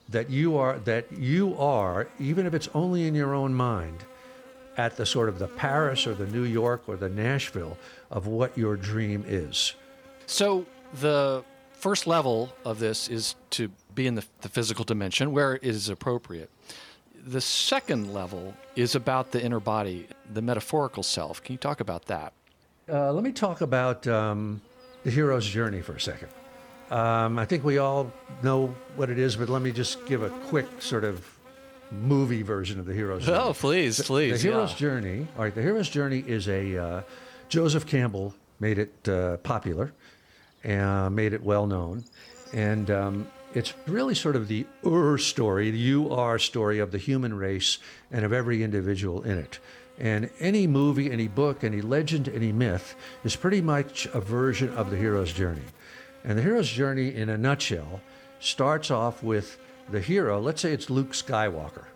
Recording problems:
electrical hum; faint; throughout; 60 Hz, 20 dB below the speech

